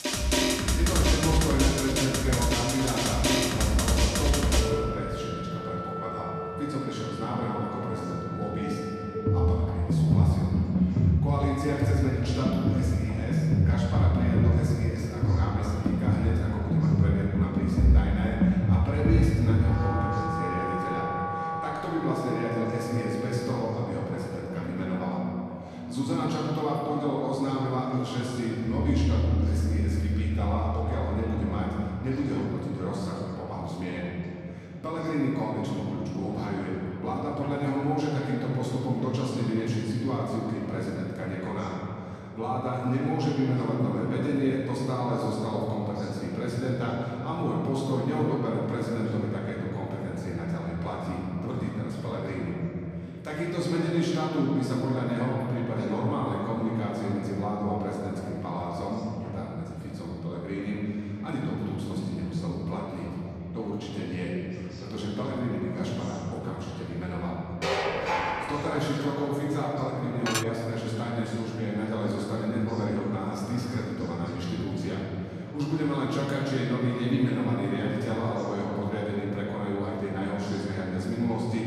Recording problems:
room echo; strong; dies away in 3 s
off-mic speech; far
background music; very loud; until 32 s; 3 dB above the speech
chatter from many people; faint; throughout; 20 dB below the speech
clattering dishes; loud; from 1:08 to 1:09; peak 3 dB above the speech
clattering dishes; noticeable; at 1:10; peak level with the speech

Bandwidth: 13.5 kHz